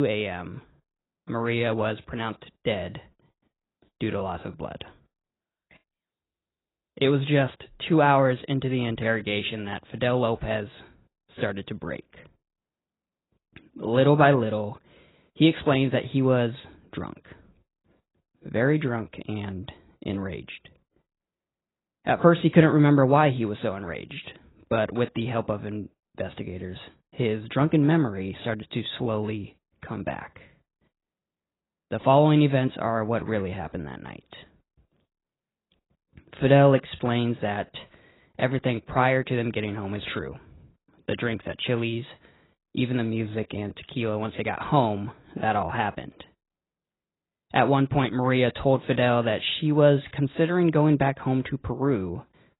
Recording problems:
garbled, watery; badly; nothing above 4 kHz
abrupt cut into speech; at the start

